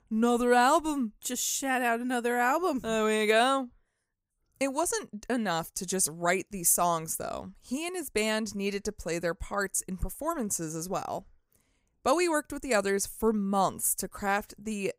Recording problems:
none

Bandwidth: 15.5 kHz